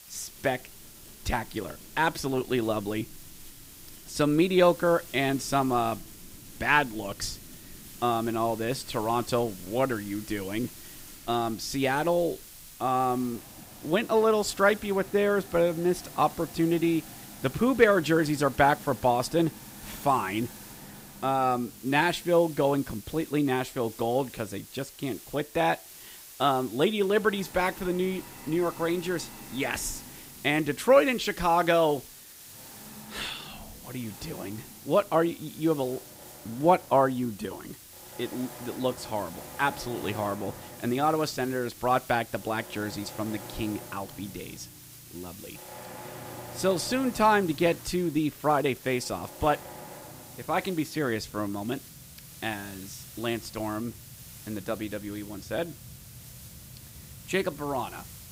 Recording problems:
hiss; noticeable; throughout; 20 dB below the speech
machinery noise; faint; throughout; 20 dB below the speech

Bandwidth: 15.5 kHz